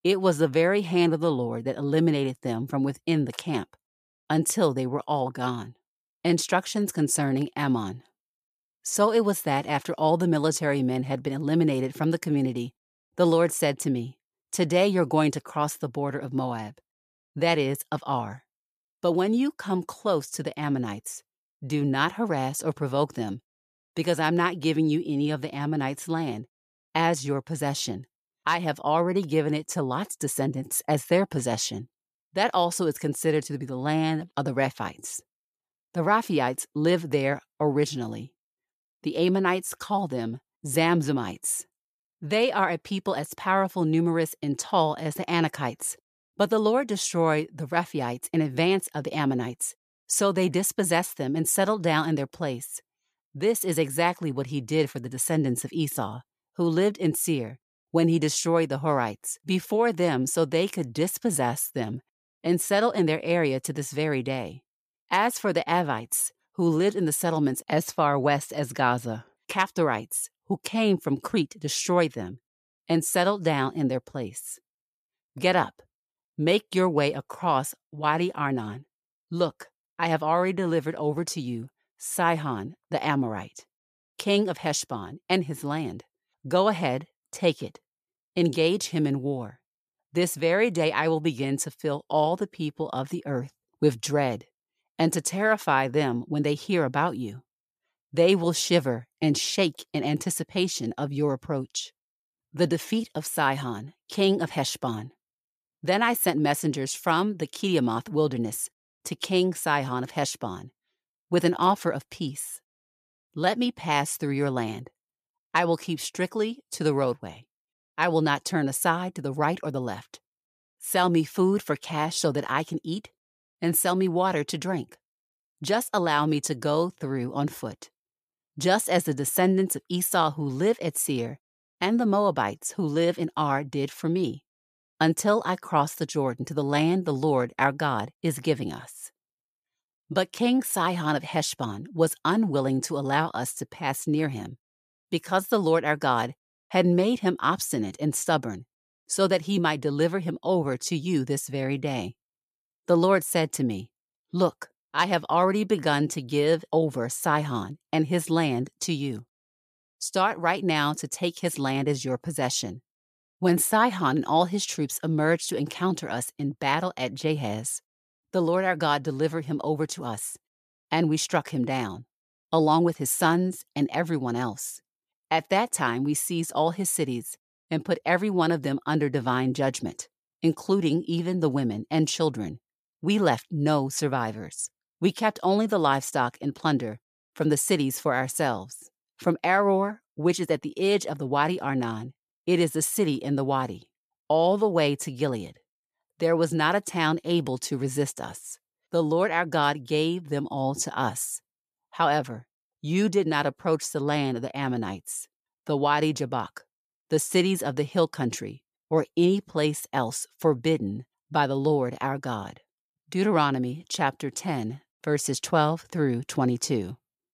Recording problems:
none

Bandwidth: 14.5 kHz